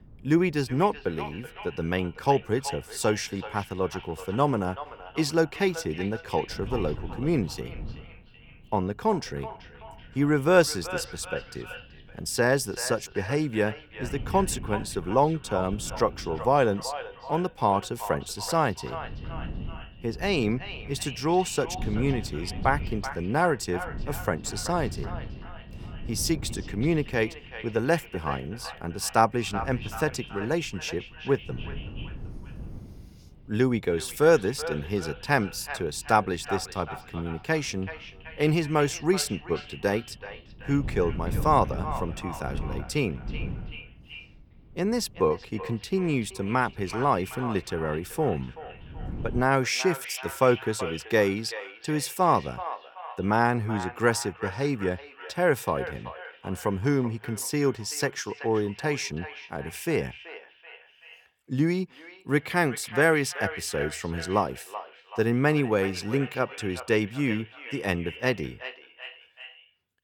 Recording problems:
echo of what is said; noticeable; throughout; 380 ms later, 15 dB below the speech
wind noise on the microphone; occasional gusts; until 49 s; 20 dB below the speech

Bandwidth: 18.5 kHz